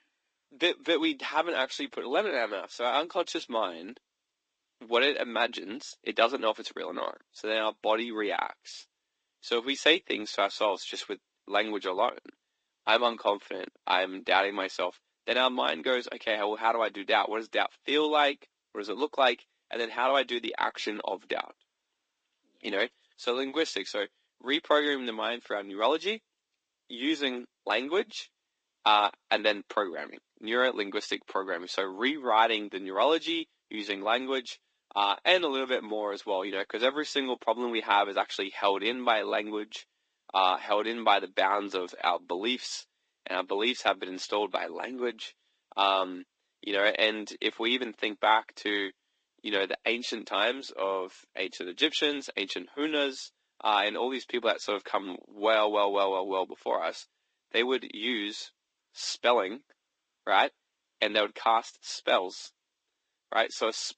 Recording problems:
thin; somewhat; fading below 300 Hz
garbled, watery; slightly; nothing above 8 kHz

